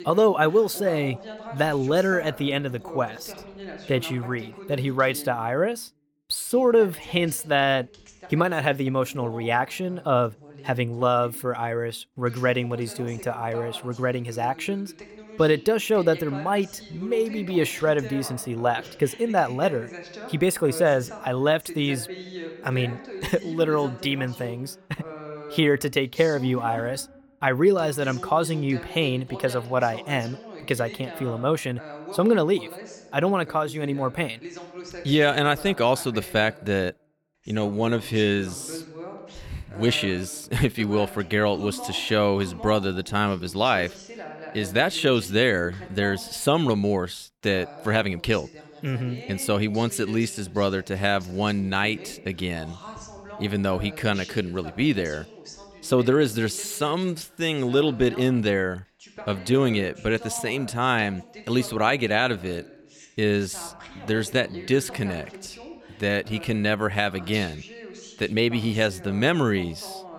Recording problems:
voice in the background; noticeable; throughout; 15 dB below the speech

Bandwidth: 17.5 kHz